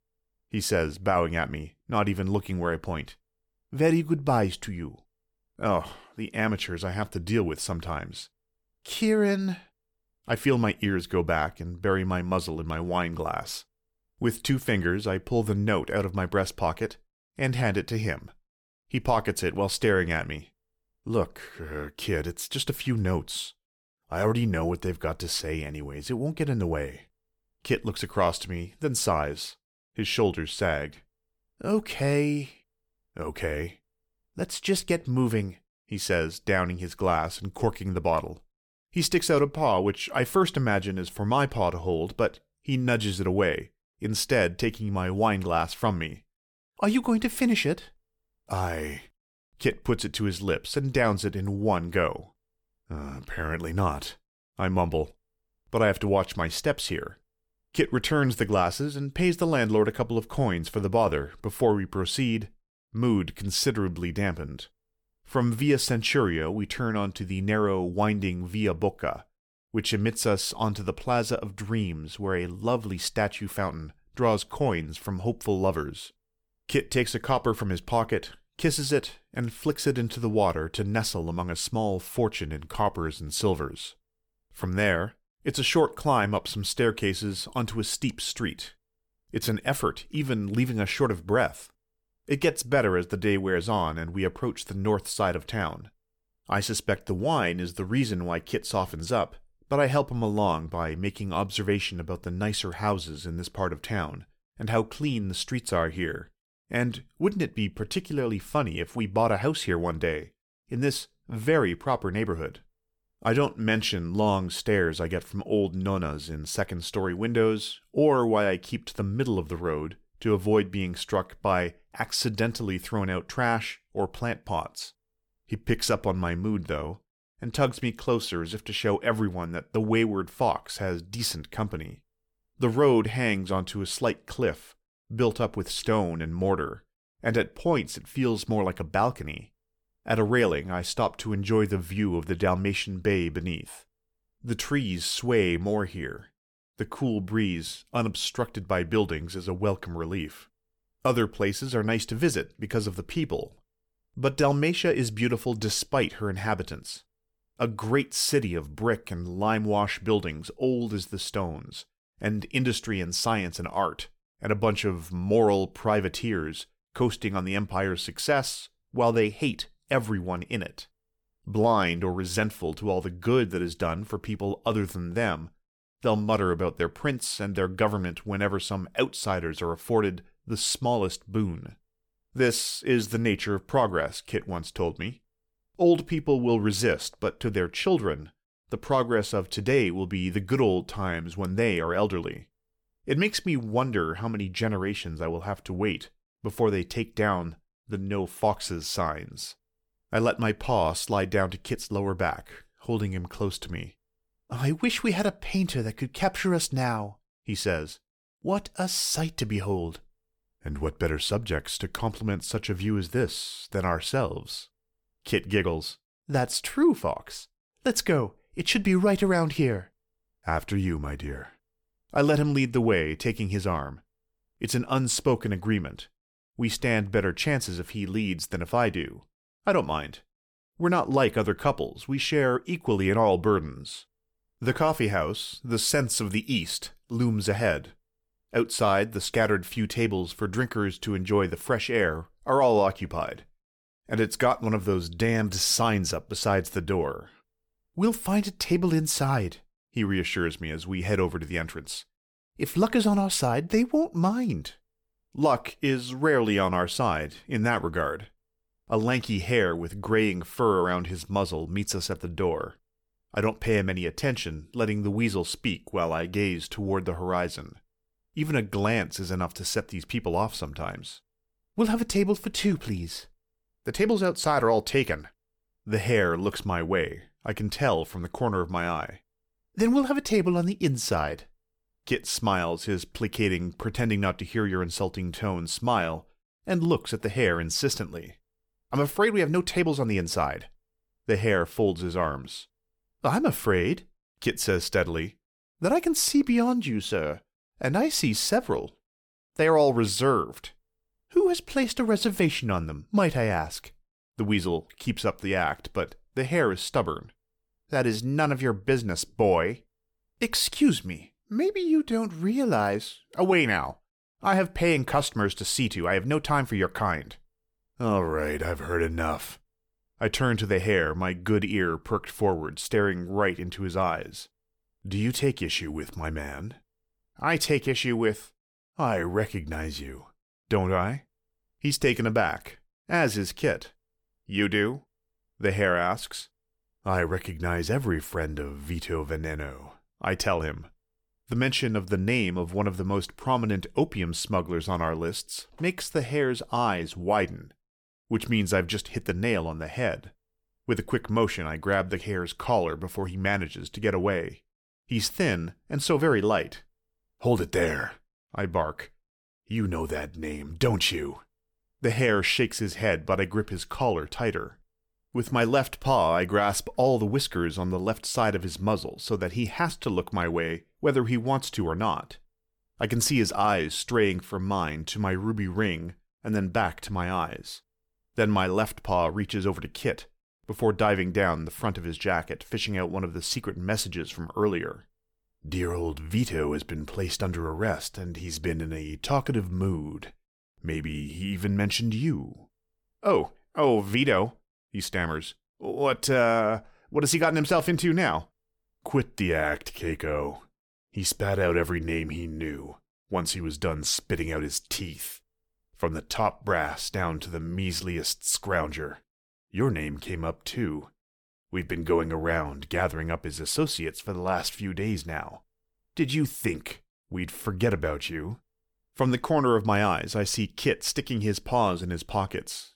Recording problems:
none

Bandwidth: 19 kHz